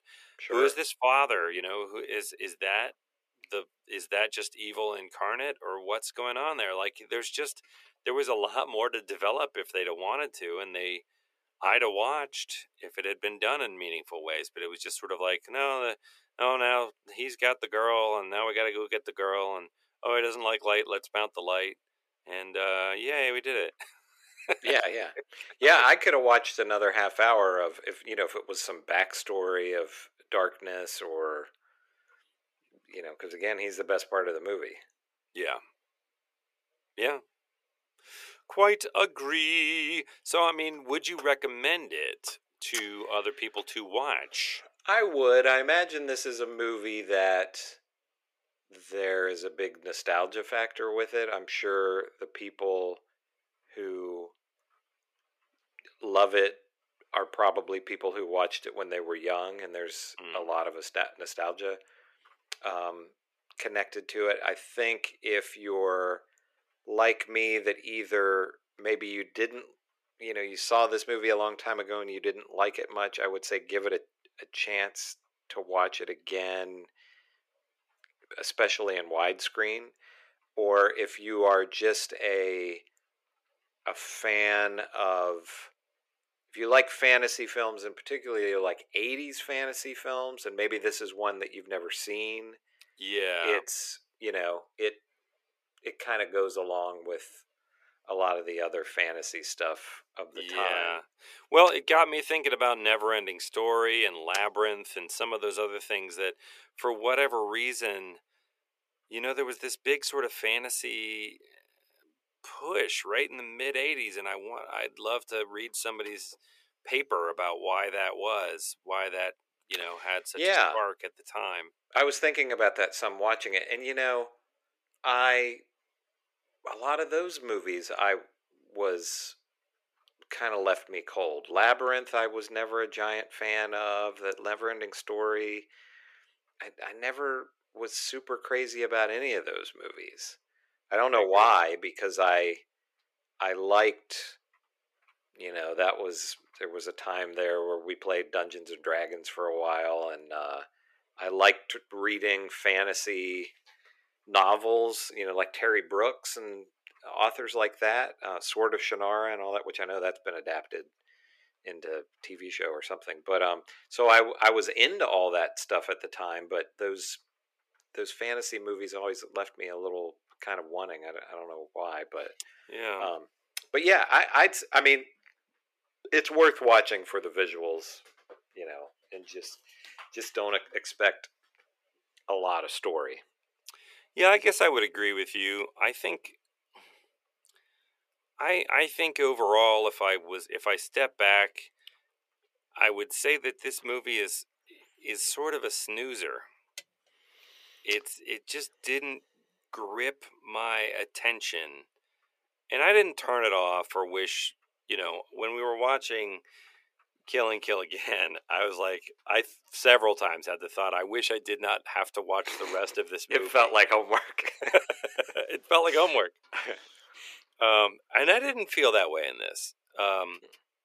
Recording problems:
thin; very; fading below 400 Hz

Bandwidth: 14.5 kHz